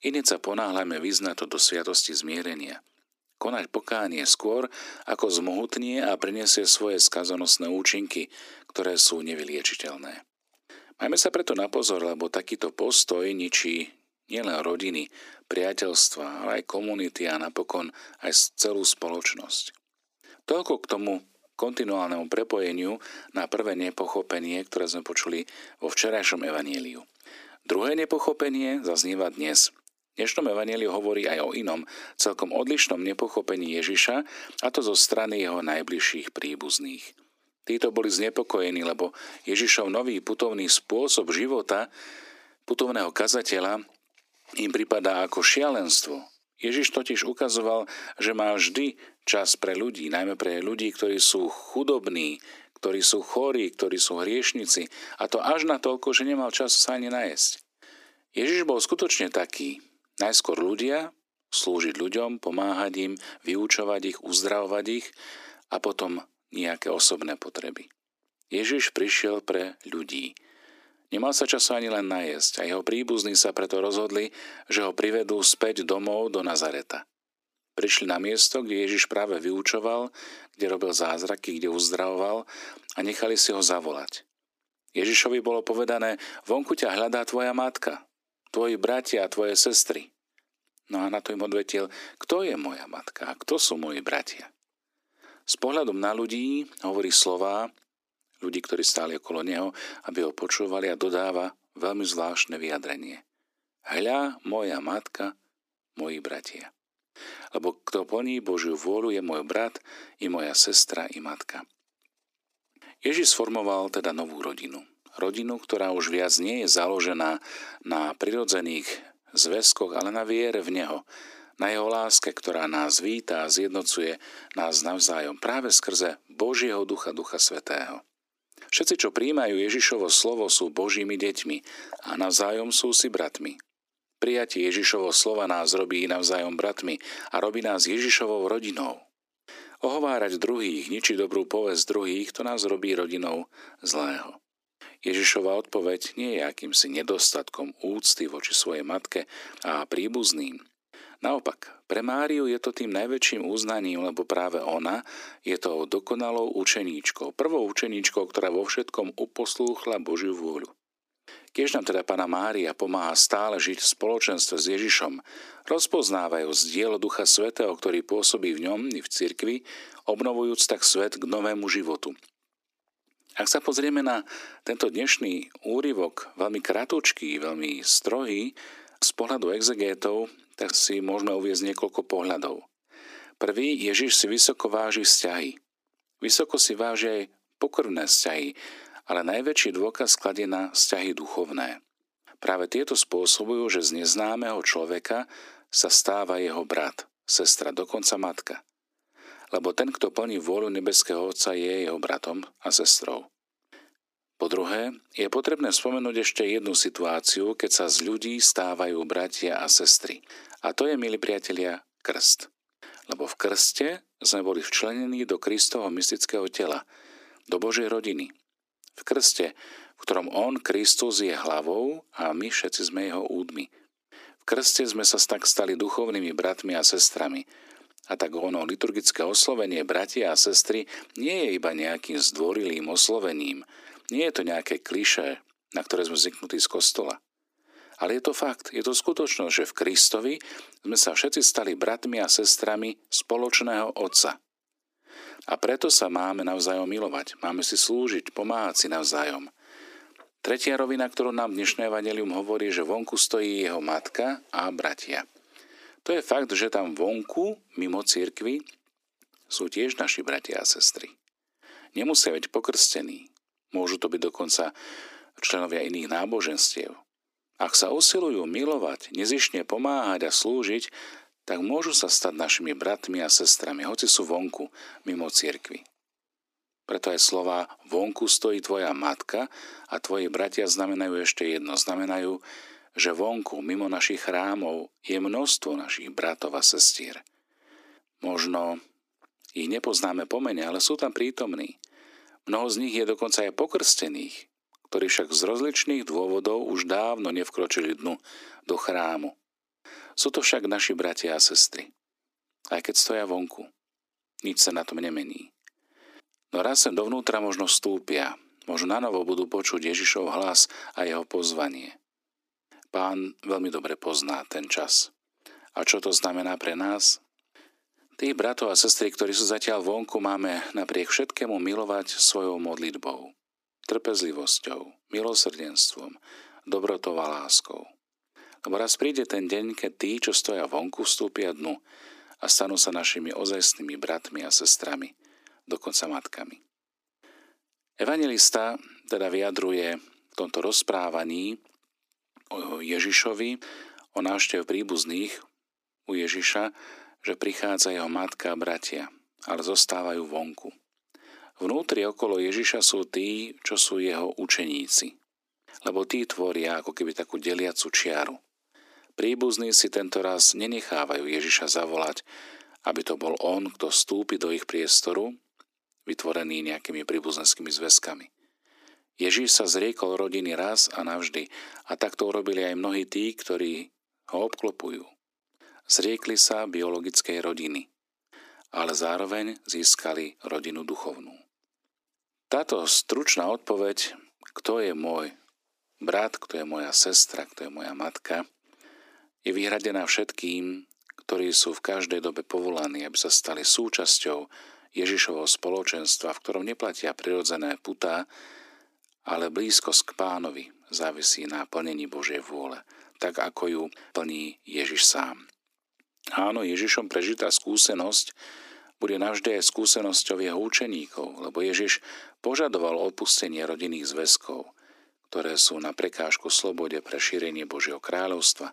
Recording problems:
thin; somewhat; fading below 300 Hz

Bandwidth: 15 kHz